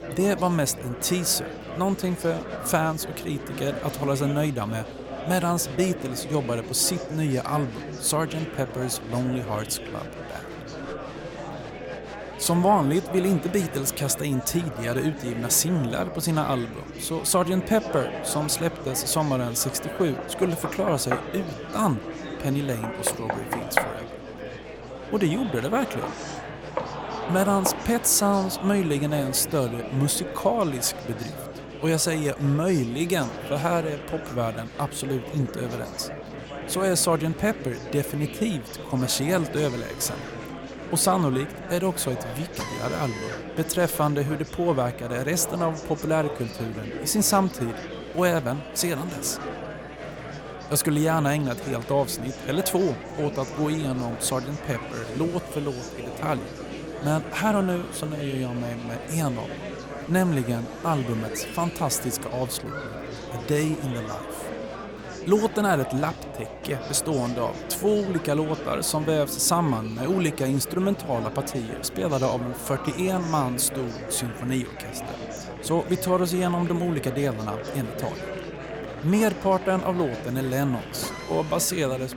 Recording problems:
murmuring crowd; noticeable; throughout; 10 dB below the speech
electrical hum; faint; throughout; 60 Hz, 30 dB below the speech
machinery noise; faint; from 39 s on; 20 dB below the speech
door banging; loud; from 20 to 28 s; peak level with the speech

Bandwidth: 17.5 kHz